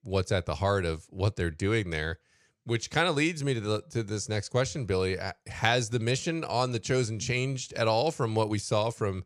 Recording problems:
none

